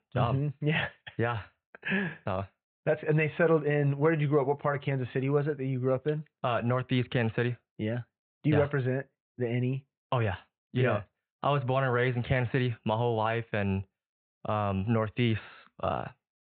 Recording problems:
high frequencies cut off; severe; nothing above 4 kHz

